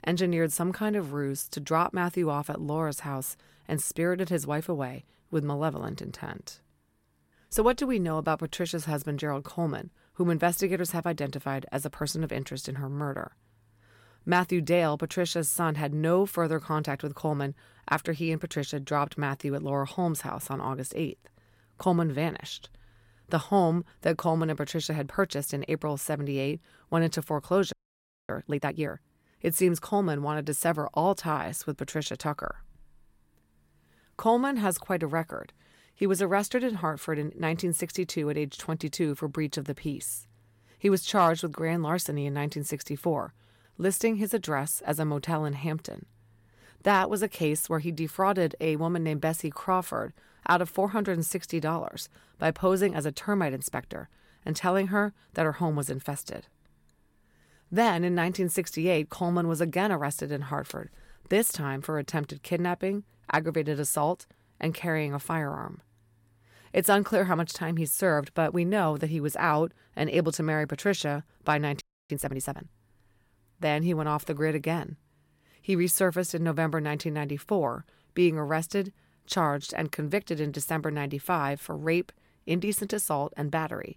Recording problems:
audio freezing; at 28 s for 0.5 s and at 1:12

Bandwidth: 16.5 kHz